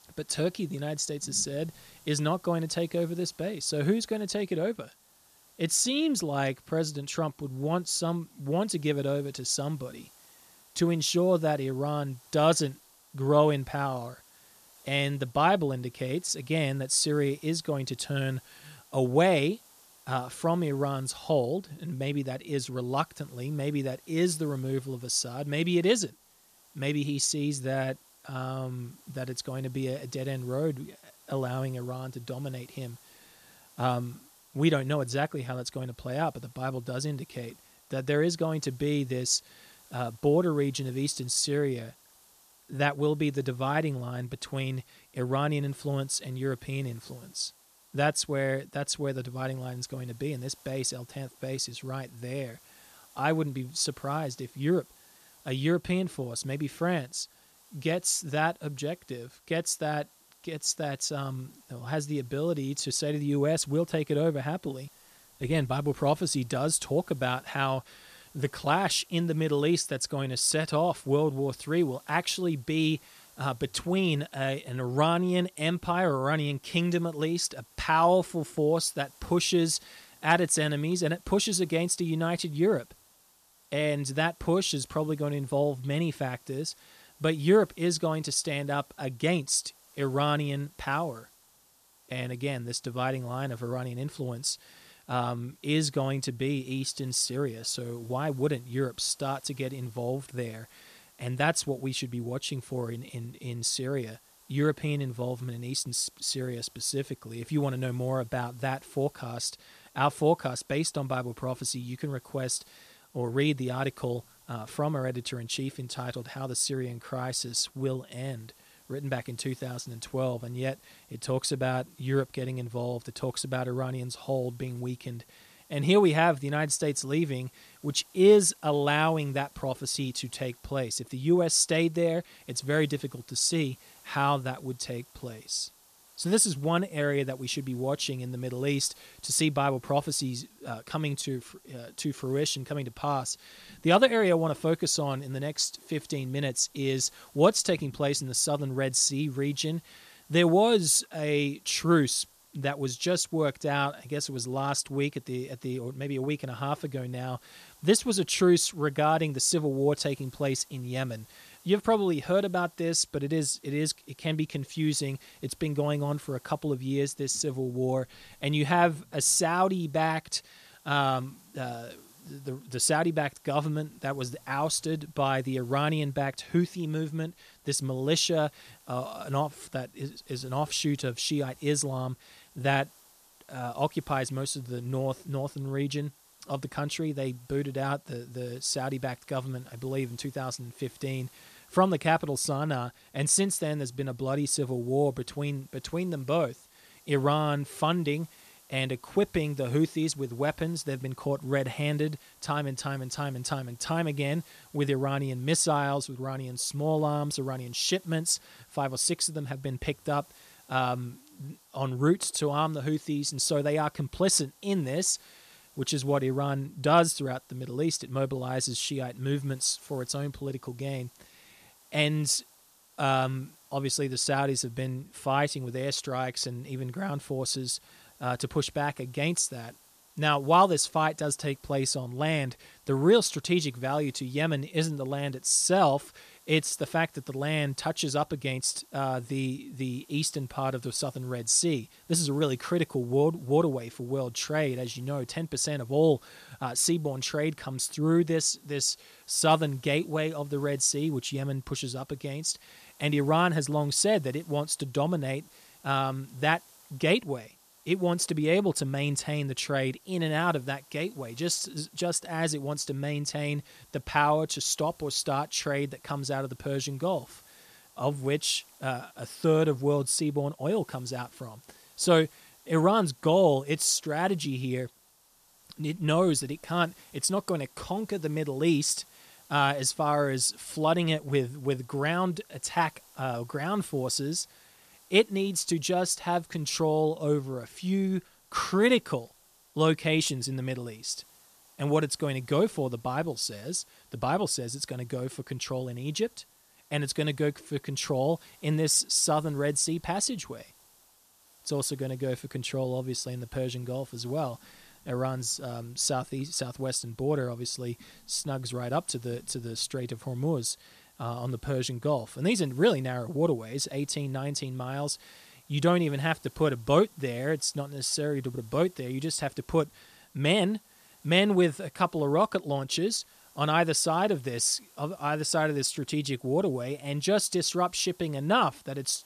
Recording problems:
hiss; faint; throughout; 25 dB below the speech

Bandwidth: 14.5 kHz